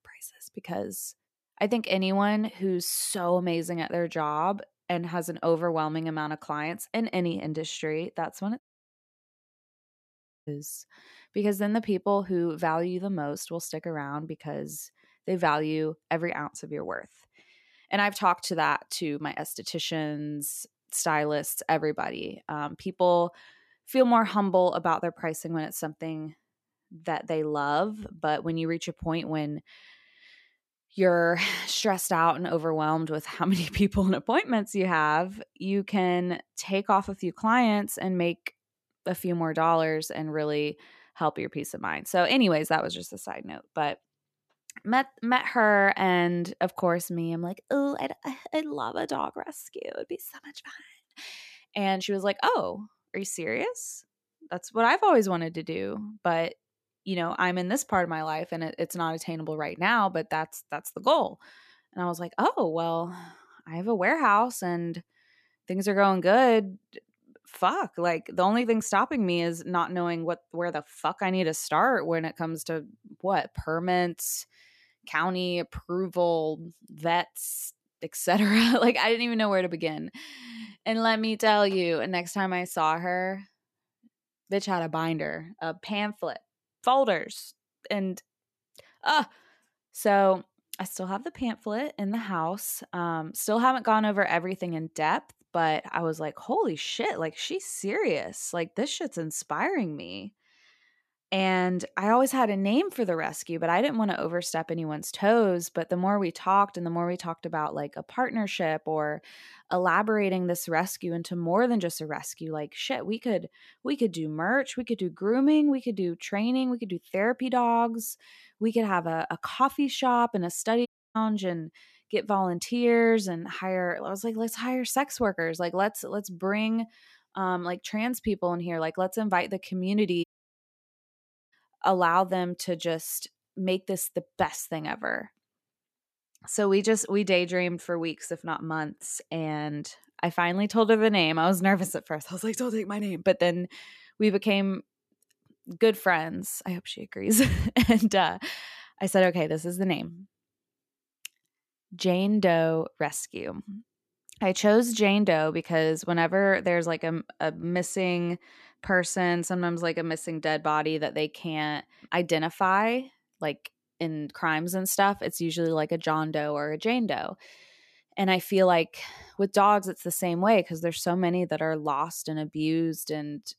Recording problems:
audio cutting out; at 8.5 s for 2 s, at 2:01 and at 2:10 for 1.5 s

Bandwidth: 14 kHz